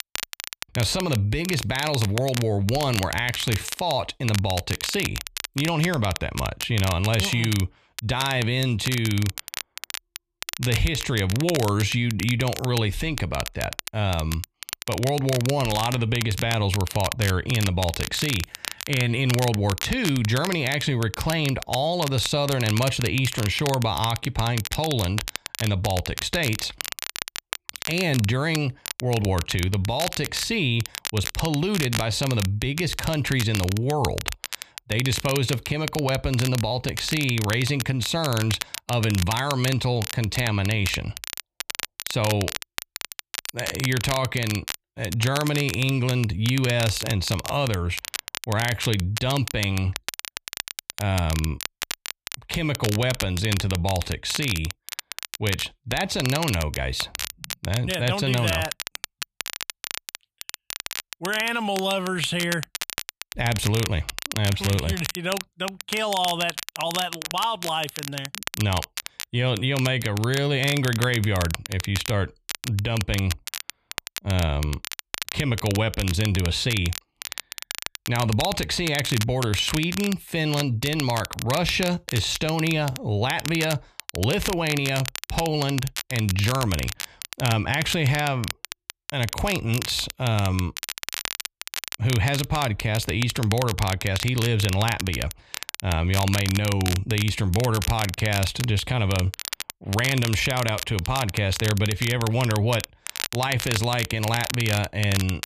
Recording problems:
crackle, like an old record; loud; 8 dB below the speech

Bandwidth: 14.5 kHz